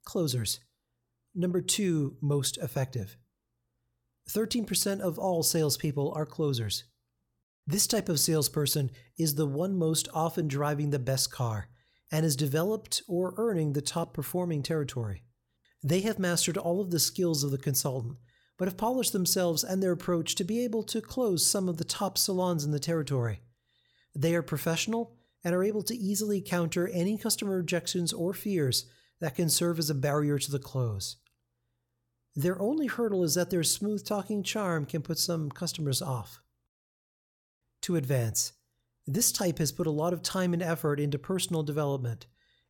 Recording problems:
none

